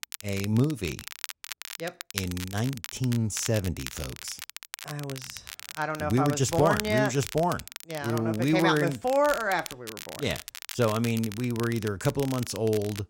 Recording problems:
crackle, like an old record; noticeable; 10 dB below the speech

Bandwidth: 16 kHz